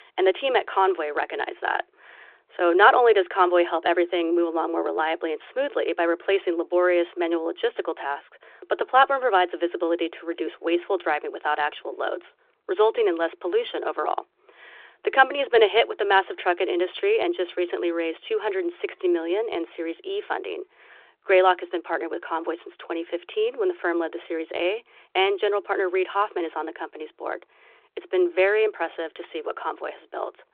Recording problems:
phone-call audio

